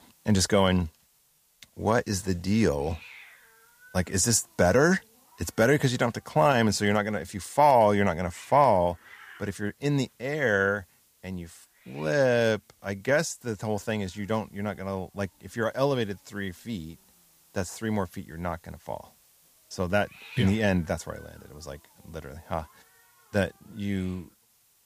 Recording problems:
hiss; faint; throughout; 25 dB below the speech

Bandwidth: 15 kHz